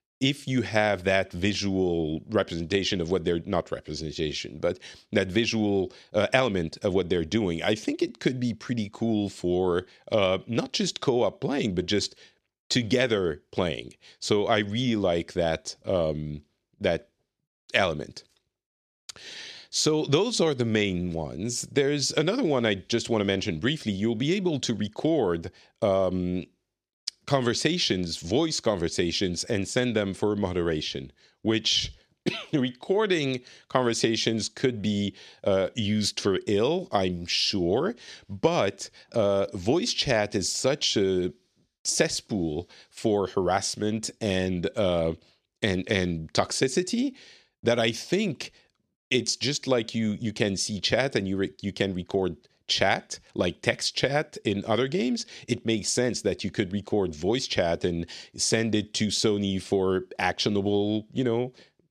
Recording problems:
none

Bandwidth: 13.5 kHz